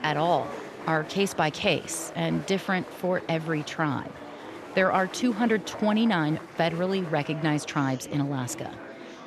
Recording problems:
murmuring crowd; noticeable; throughout; 15 dB below the speech

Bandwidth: 13.5 kHz